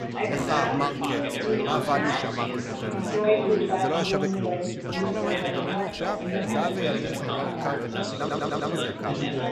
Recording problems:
chatter from many people; very loud; throughout; 4 dB above the speech
audio stuttering; at 8 s

